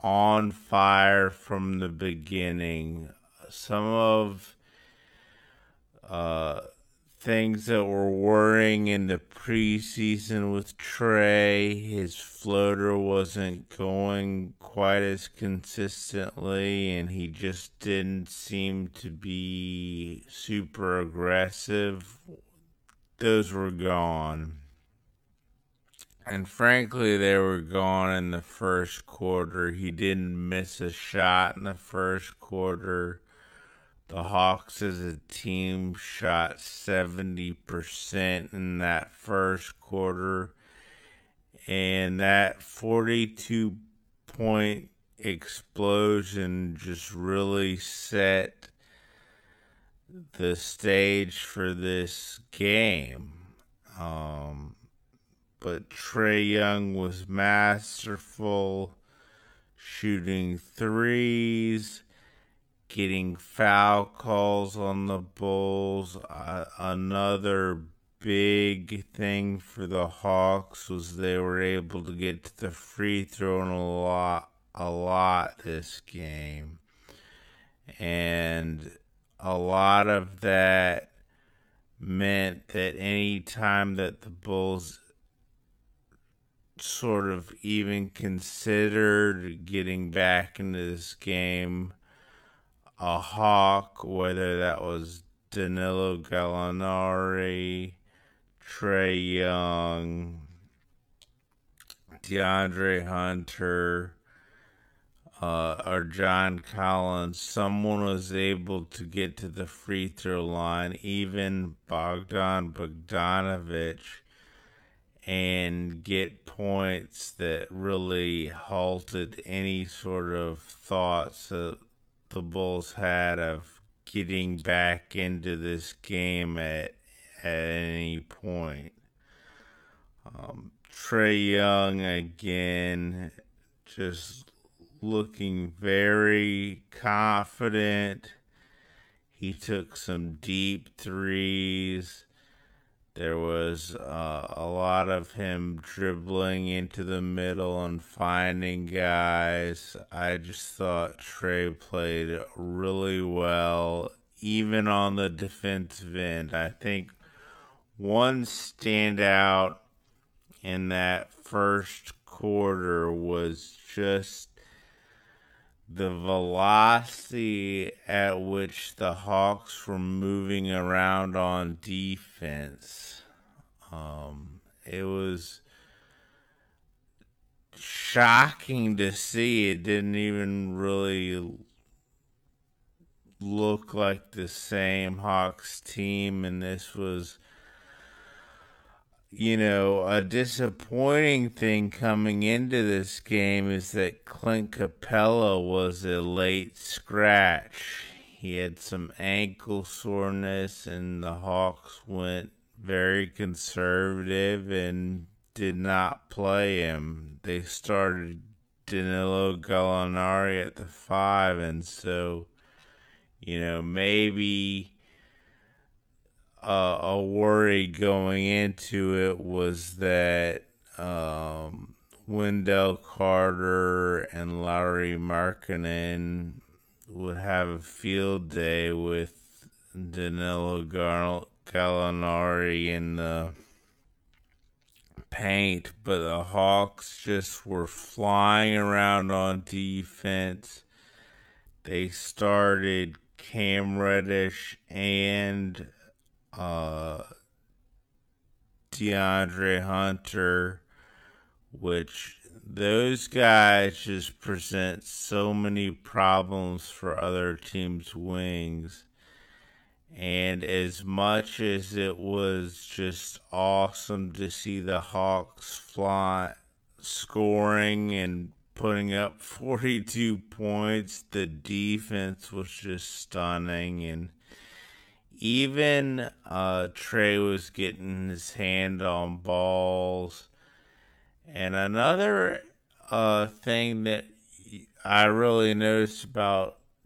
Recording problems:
wrong speed, natural pitch; too slow; 0.5 times normal speed

